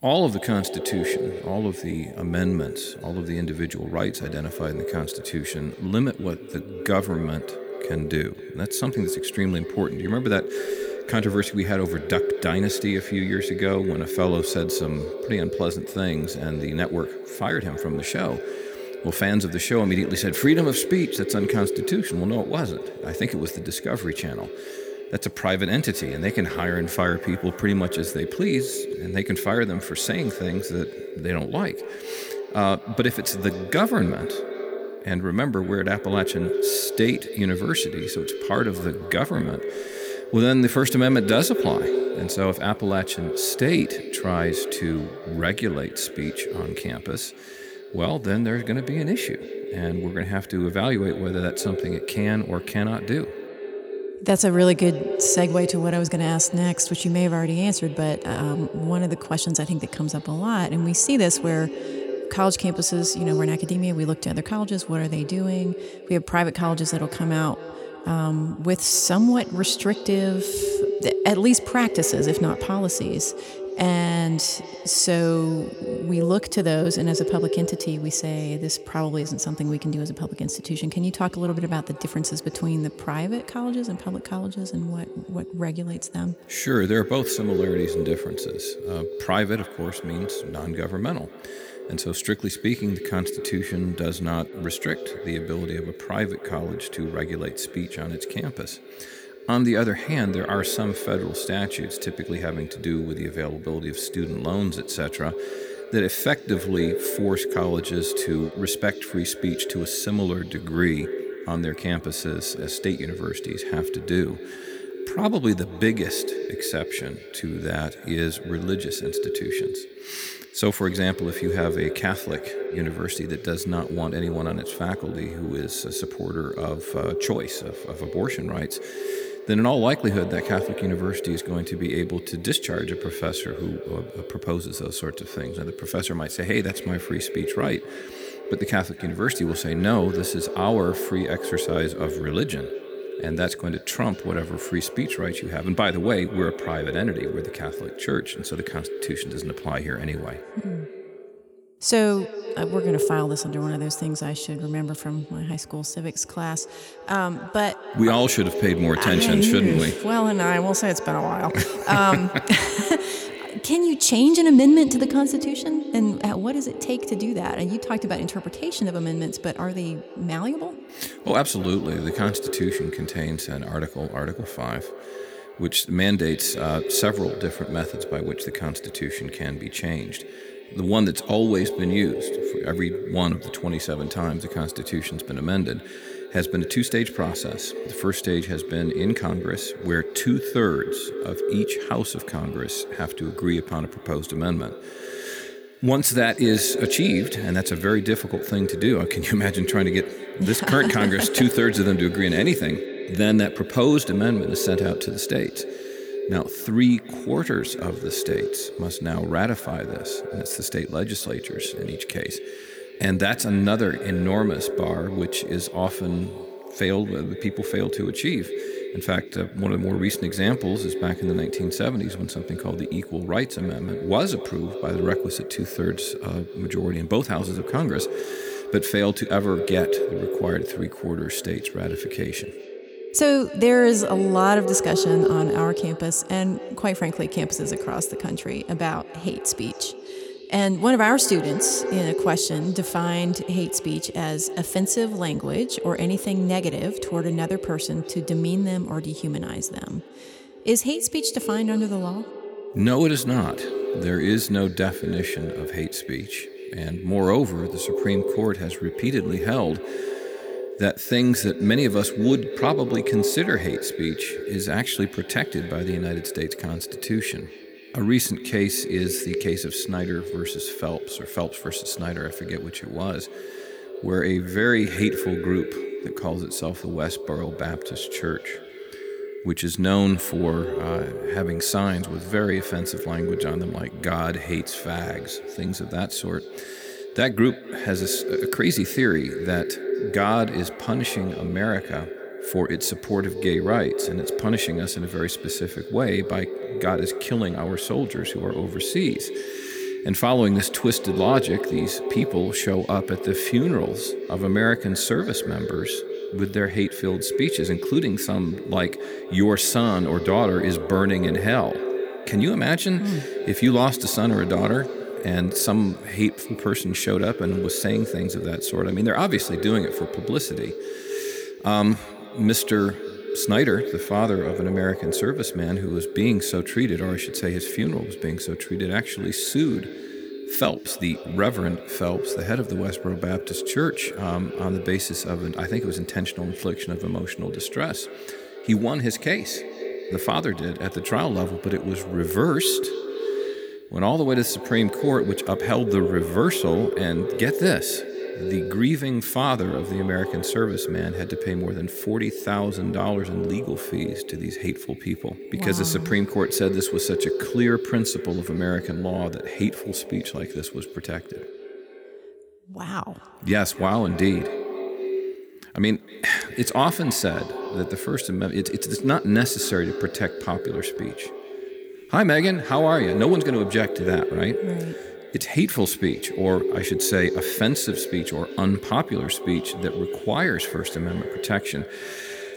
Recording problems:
echo of what is said; strong; throughout; 240 ms later, 8 dB below the speech

